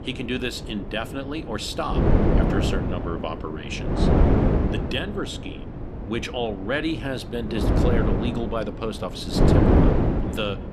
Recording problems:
wind noise on the microphone; heavy; 2 dB above the speech

